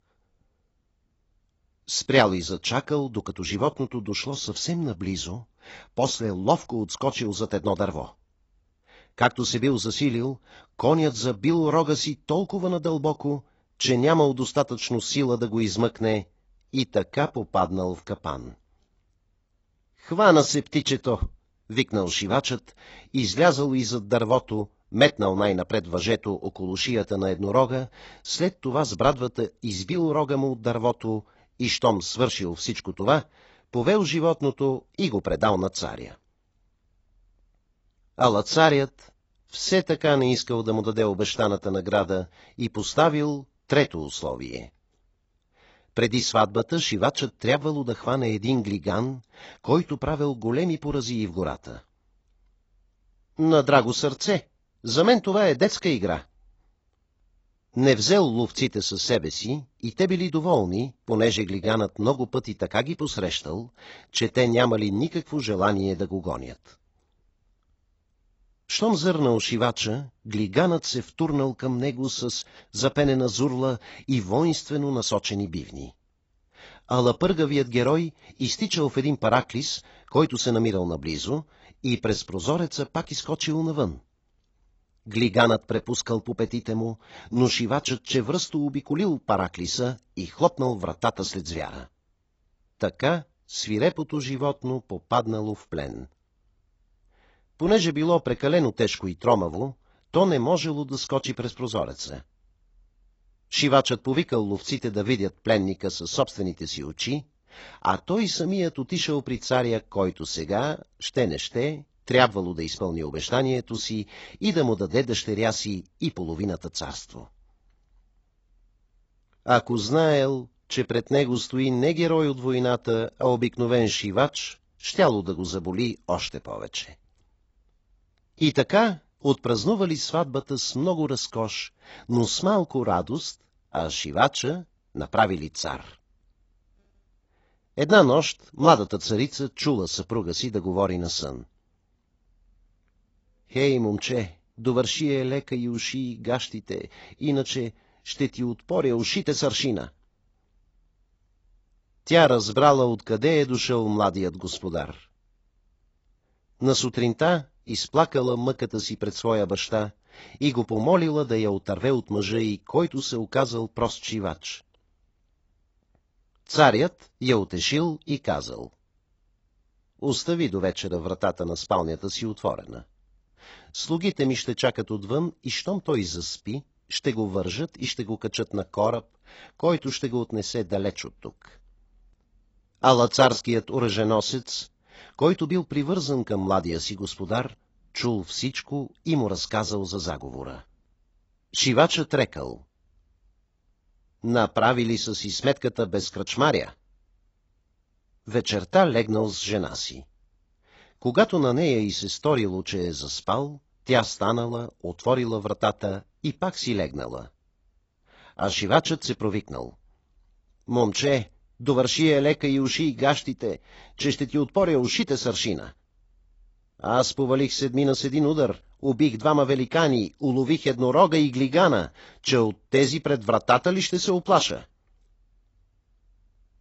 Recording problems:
garbled, watery; badly; nothing above 7.5 kHz

